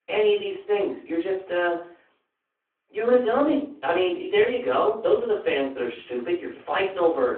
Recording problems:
off-mic speech; far
room echo; slight; dies away in 0.3 s
phone-call audio

